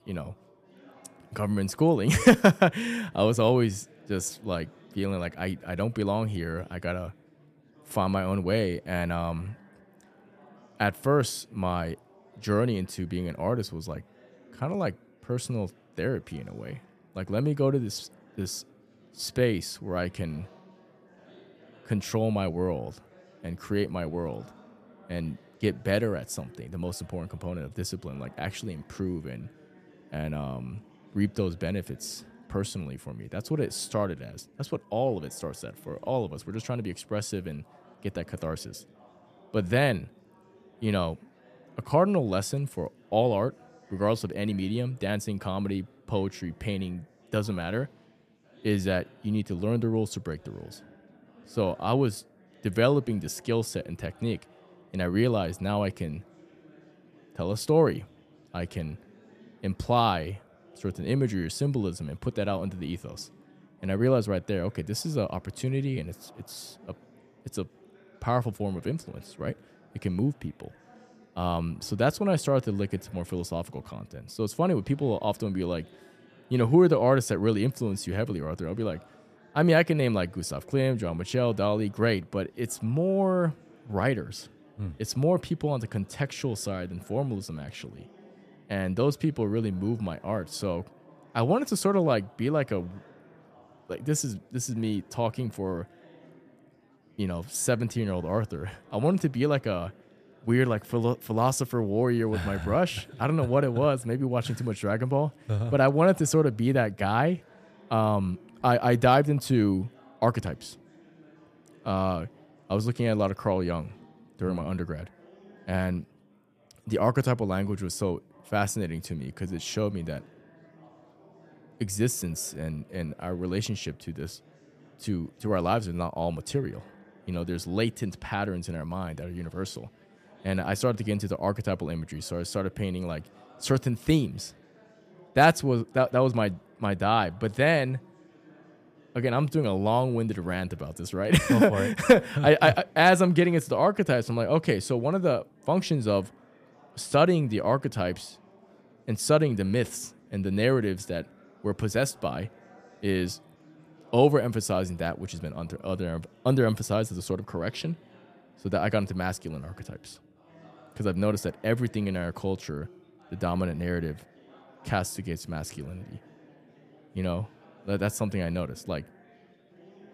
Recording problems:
chatter from many people; faint; throughout; 30 dB below the speech

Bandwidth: 14.5 kHz